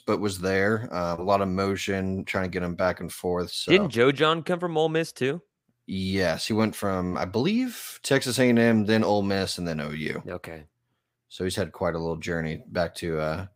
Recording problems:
none

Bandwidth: 15.5 kHz